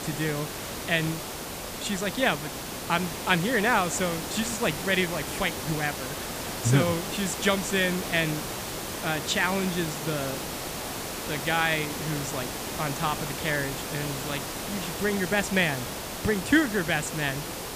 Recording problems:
hiss; loud; throughout; 5 dB below the speech

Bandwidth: 15 kHz